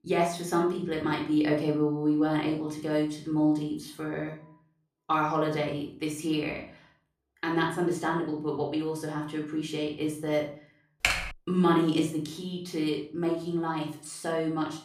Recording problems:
room echo; noticeable; dies away in 0.4 s
off-mic speech; somewhat distant
keyboard typing; loud; at 11 s; peak 2 dB above the speech

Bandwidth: 15 kHz